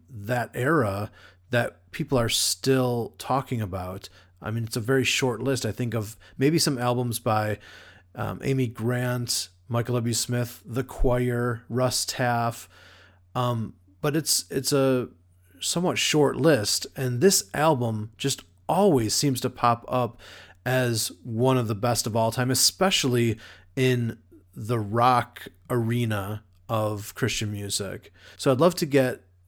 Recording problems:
none

